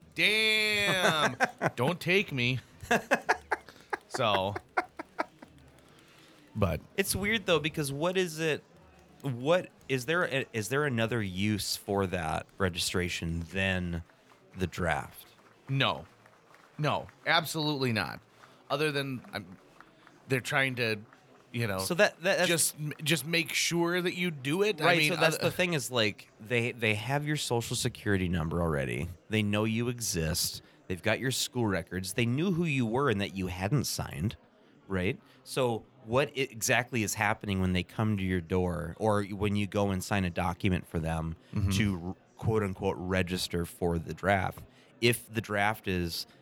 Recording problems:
murmuring crowd; faint; throughout; 30 dB below the speech

